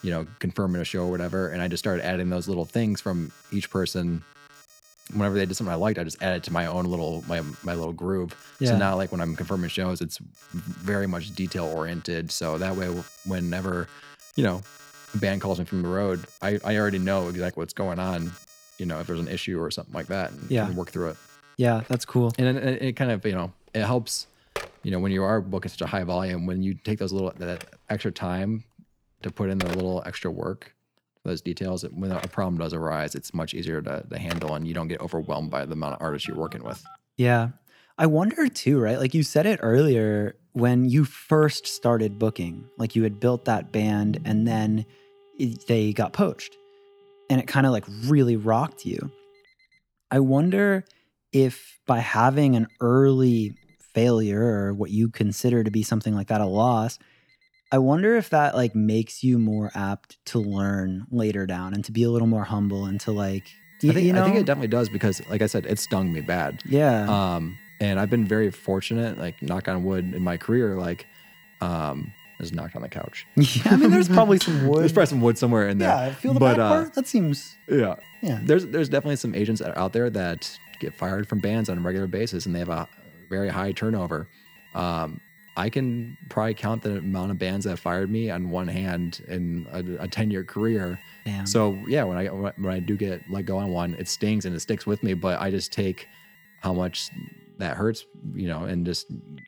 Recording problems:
alarms or sirens; faint; throughout; 20 dB below the speech
clattering dishes; noticeable; at 1:14; peak 4 dB below the speech

